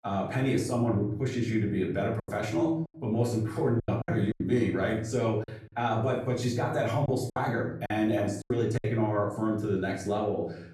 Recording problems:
off-mic speech; far
room echo; slight; dies away in 0.6 s
choppy; very; 6% of the speech affected

